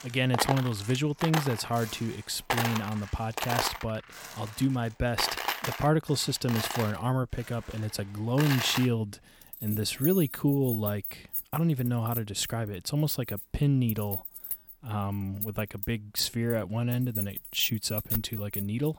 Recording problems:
household noises; loud; throughout; 5 dB below the speech

